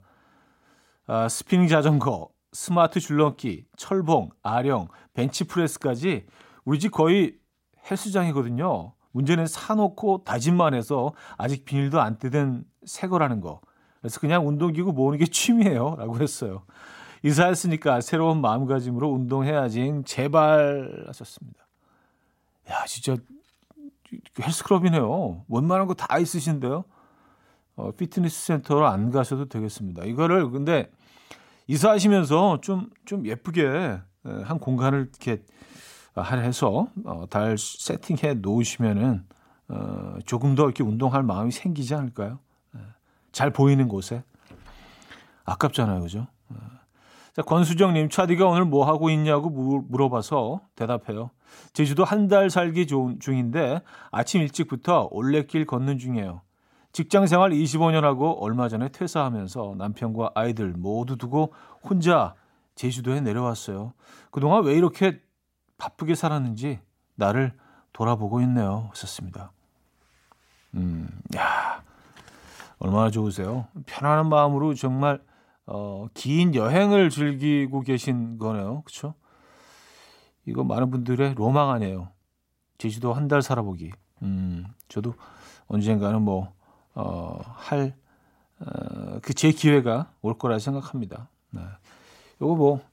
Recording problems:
none

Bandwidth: 16 kHz